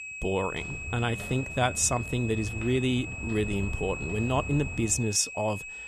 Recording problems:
high-pitched whine; loud; throughout; 2.5 kHz, 8 dB below the speech
footsteps; noticeable; until 5 s; peak 10 dB below the speech
uneven, jittery; slightly; from 1 to 5.5 s

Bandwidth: 14.5 kHz